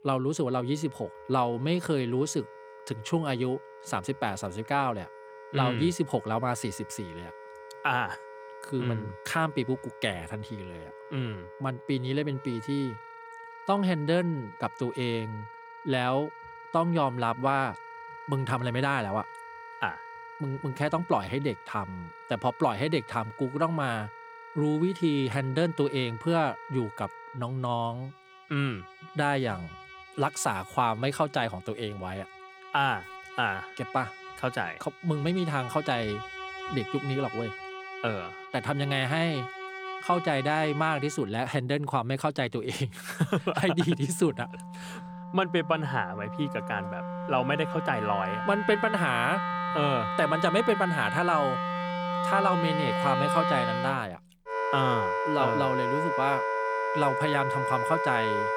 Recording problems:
background music; loud; throughout; 5 dB below the speech

